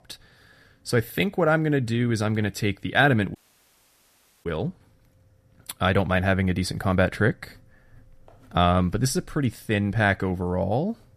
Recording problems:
audio cutting out; at 3.5 s for 1 s

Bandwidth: 14.5 kHz